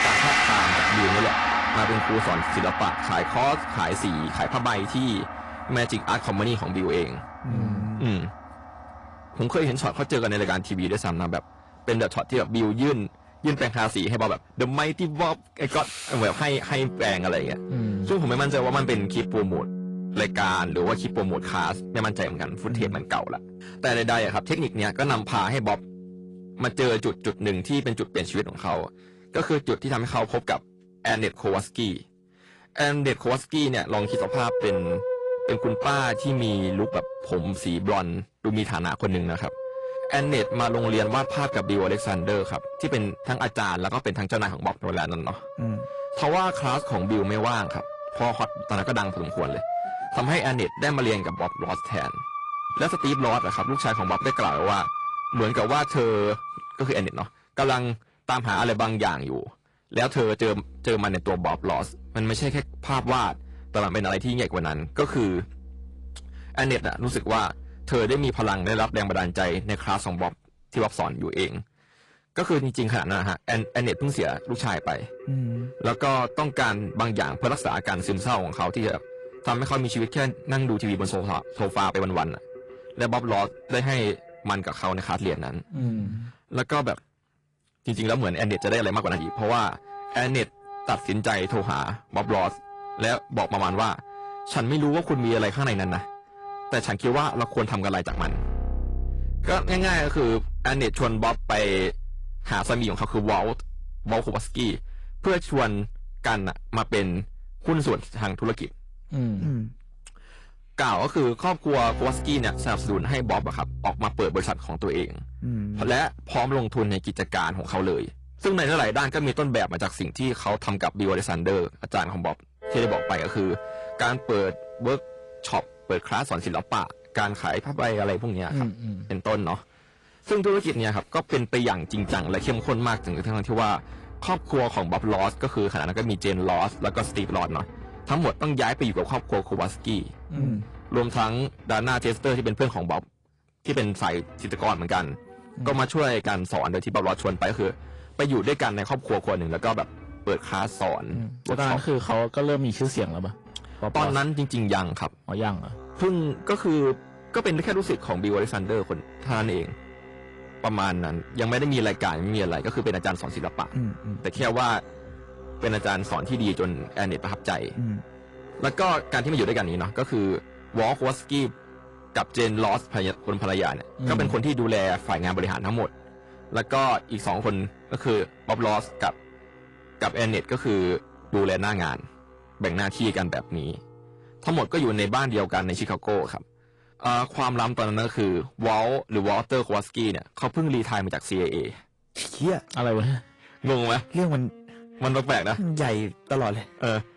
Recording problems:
distortion; heavy; 8 dB below the speech
garbled, watery; slightly; nothing above 10.5 kHz
background music; loud; throughout; 8 dB below the speech

